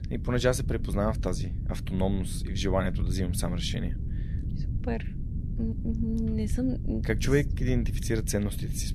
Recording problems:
low rumble; noticeable; throughout; 15 dB below the speech

